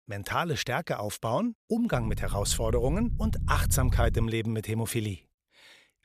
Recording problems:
low rumble; noticeable; from 2 to 4 s; 15 dB below the speech

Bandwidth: 14.5 kHz